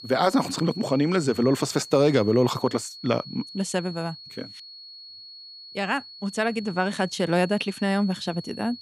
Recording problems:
high-pitched whine; noticeable; throughout; 4.5 kHz, 15 dB below the speech

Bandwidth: 15 kHz